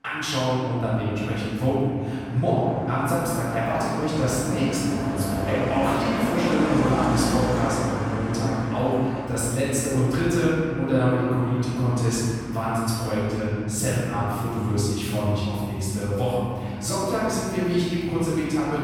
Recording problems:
room echo; strong; dies away in 2.9 s
off-mic speech; far
traffic noise; very faint; throughout; 8 dB below the speech

